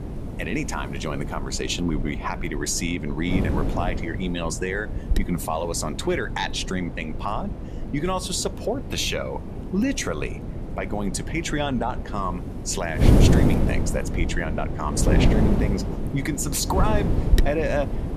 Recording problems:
wind noise on the microphone; heavy; 6 dB below the speech

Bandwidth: 14.5 kHz